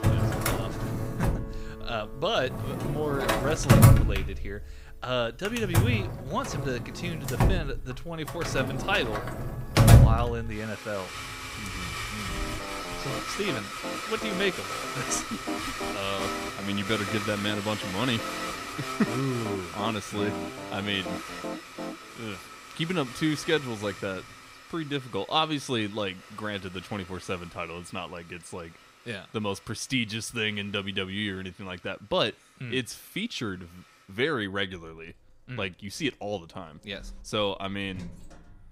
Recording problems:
household noises; very loud; throughout; 3 dB above the speech
background music; loud; until 22 s; 9 dB below the speech

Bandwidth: 15.5 kHz